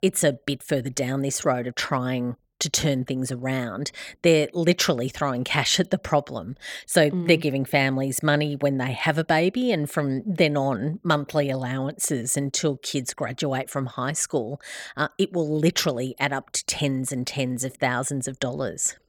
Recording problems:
none

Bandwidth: 18 kHz